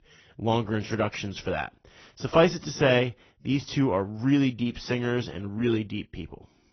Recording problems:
garbled, watery; badly
high frequencies cut off; noticeable; nothing above 6 kHz

